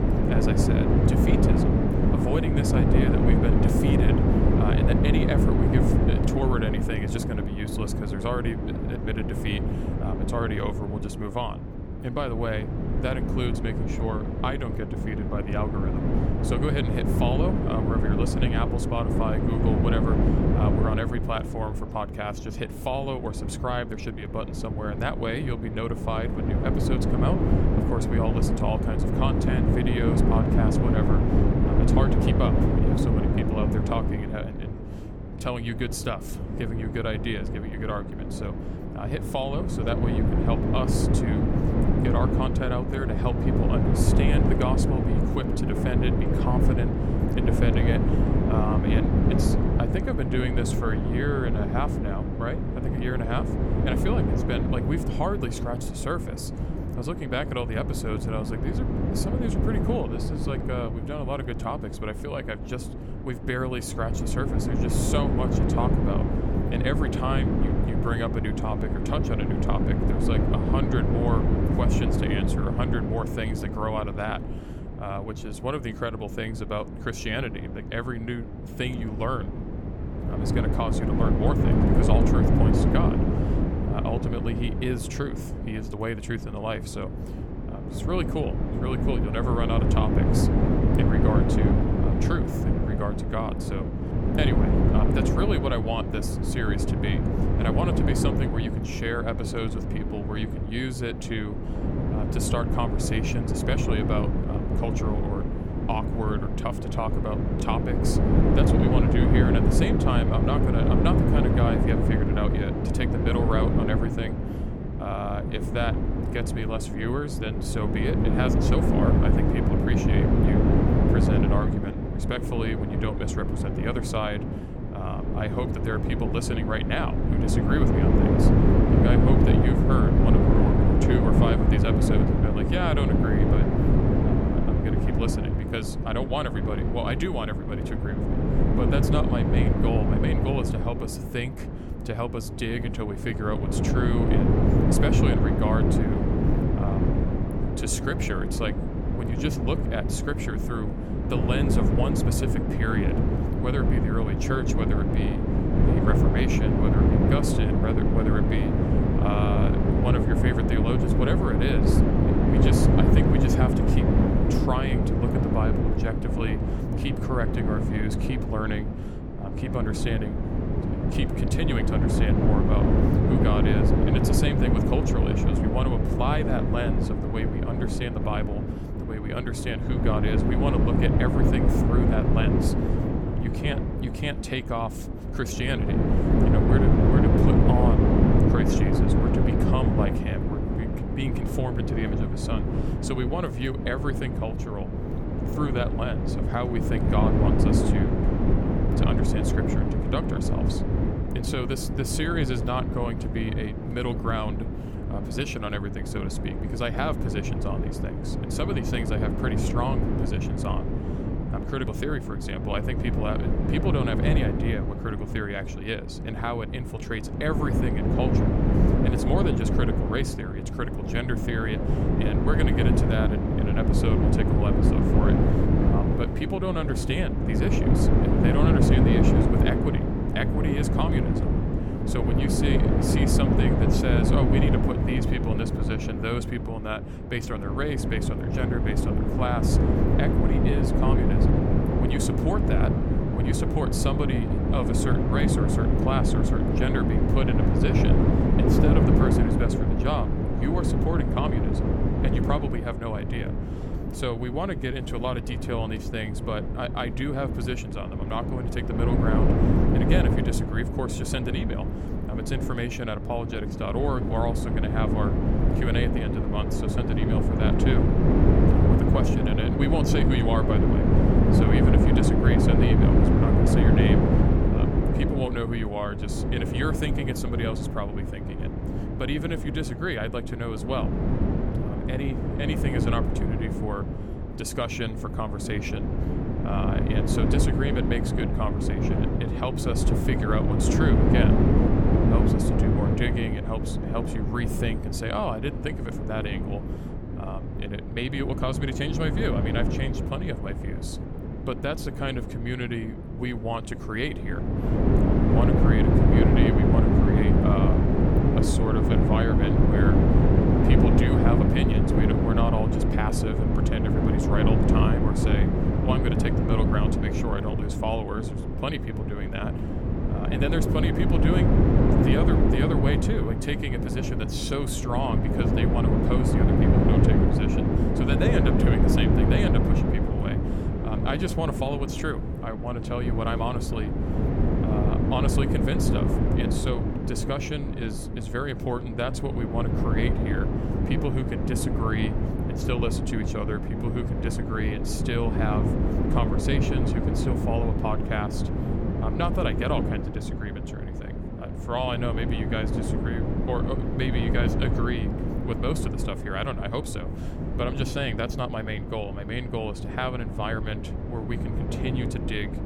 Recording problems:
wind noise on the microphone; heavy; 1 dB above the speech

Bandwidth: 18.5 kHz